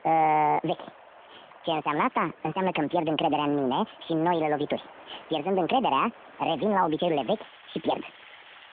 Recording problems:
wrong speed and pitch; too fast and too high; 1.6 times normal speed
phone-call audio
rain or running water; faint; throughout; 20 dB below the speech

